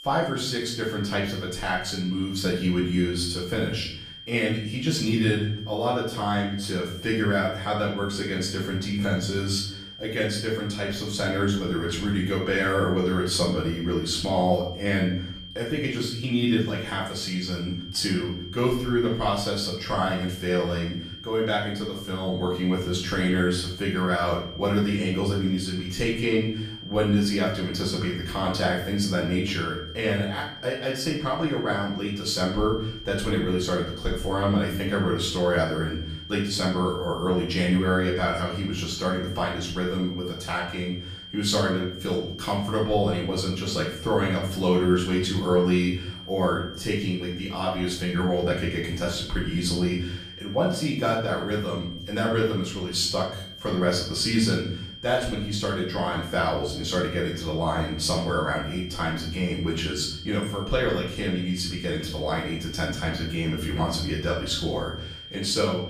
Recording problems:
off-mic speech; far
room echo; noticeable; dies away in 0.6 s
high-pitched whine; noticeable; throughout; 3 kHz, 15 dB below the speech

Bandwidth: 15 kHz